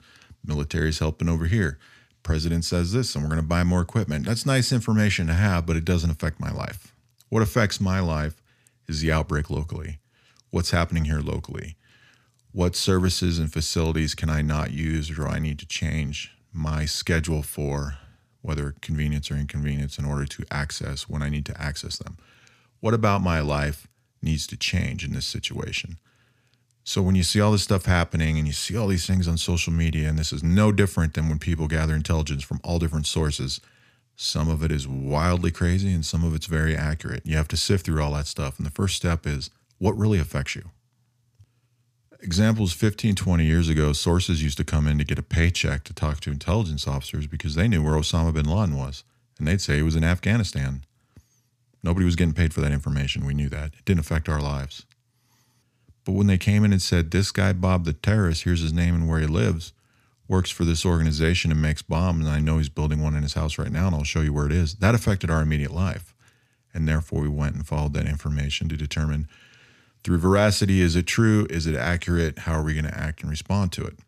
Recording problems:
none

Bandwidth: 14.5 kHz